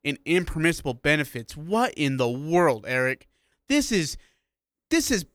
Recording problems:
none

